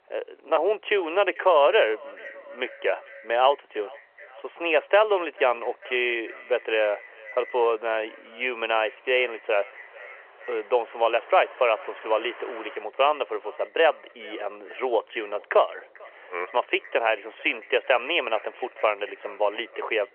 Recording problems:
echo of what is said; faint; throughout; 440 ms later, 20 dB below the speech
phone-call audio; nothing above 3 kHz
traffic noise; faint; throughout; 25 dB below the speech

